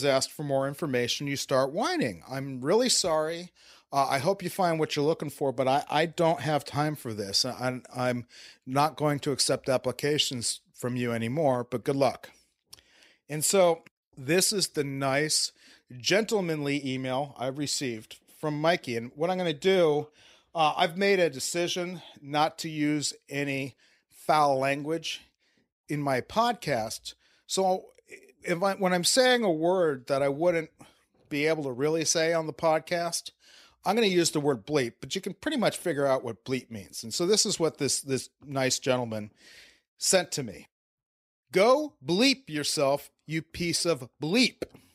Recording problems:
abrupt cut into speech; at the start

